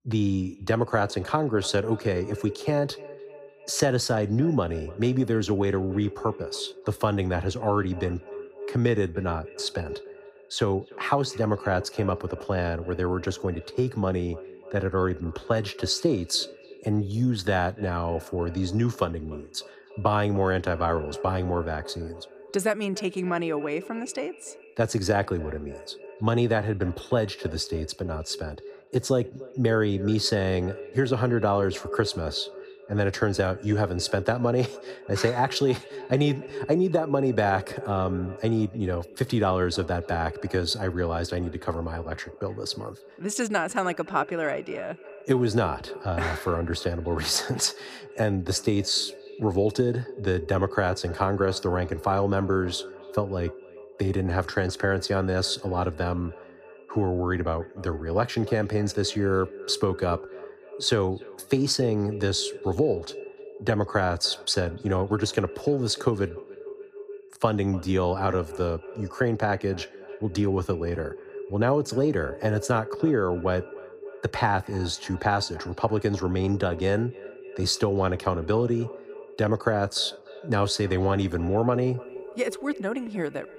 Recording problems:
echo of what is said; noticeable; throughout; 300 ms later, 15 dB below the speech

